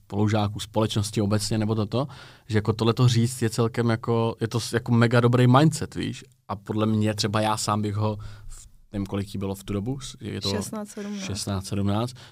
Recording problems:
none

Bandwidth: 15.5 kHz